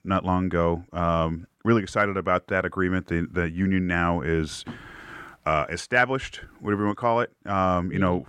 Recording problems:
muffled; slightly; fading above 2.5 kHz

